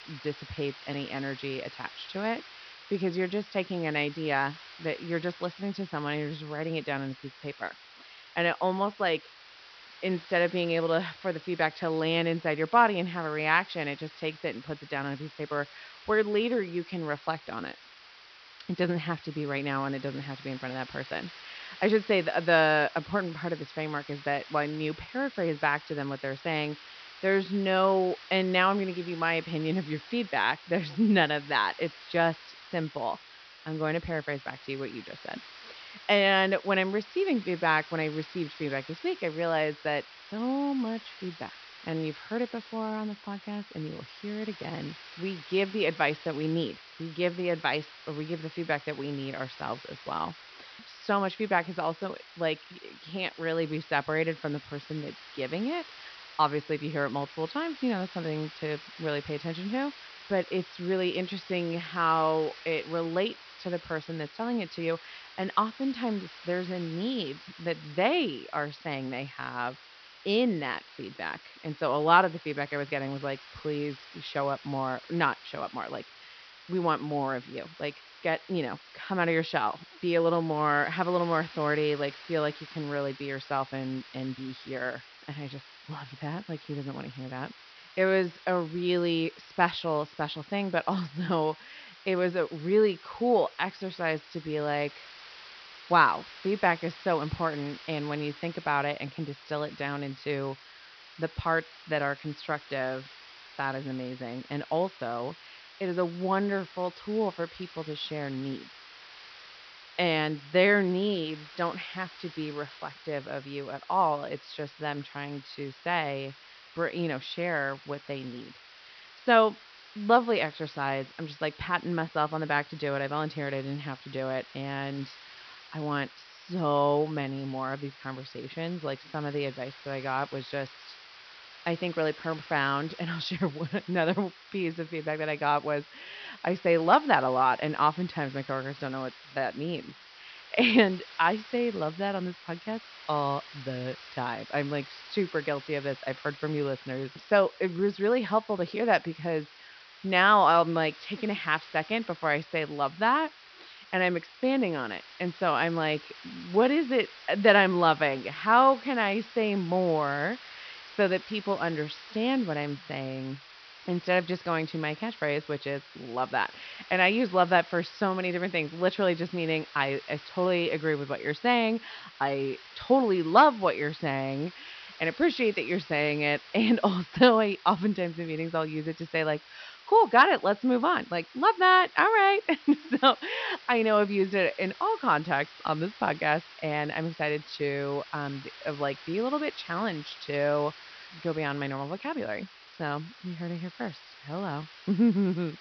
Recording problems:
high frequencies cut off; noticeable; nothing above 5.5 kHz
hiss; noticeable; throughout; 20 dB below the speech

